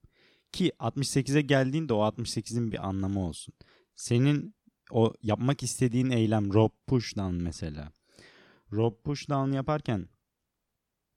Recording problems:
uneven, jittery; strongly; from 1 to 10 s

